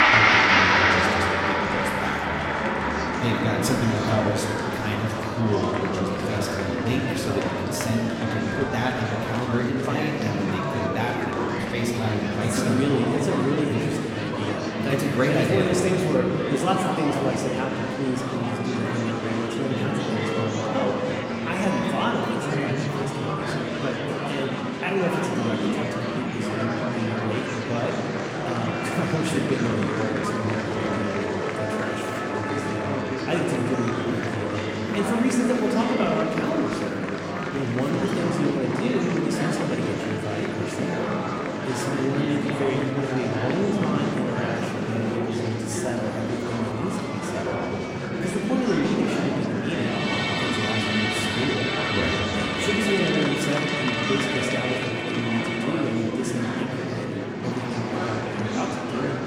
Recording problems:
room echo; noticeable; dies away in 2.4 s
off-mic speech; somewhat distant
background music; loud; throughout; 1 dB below the speech
murmuring crowd; loud; throughout; 2 dB below the speech

